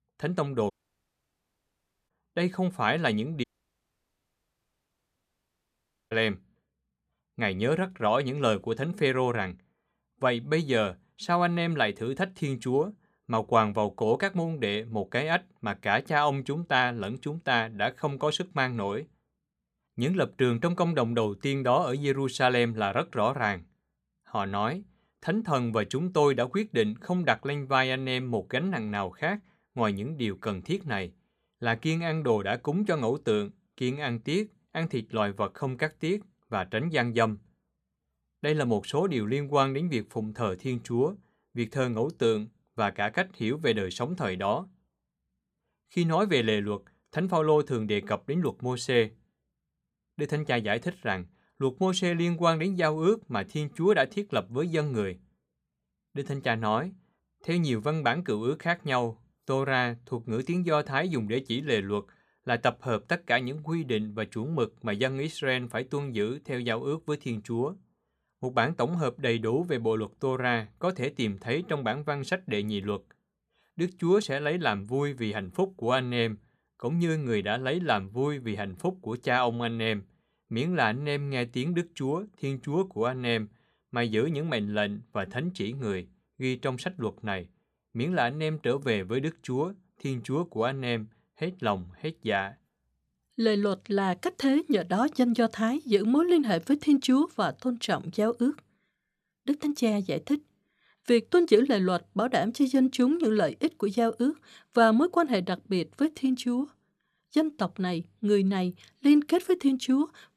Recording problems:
audio cutting out; at 0.5 s for 1.5 s and at 3.5 s for 2.5 s

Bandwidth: 14.5 kHz